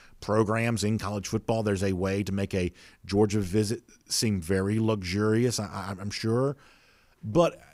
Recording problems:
none

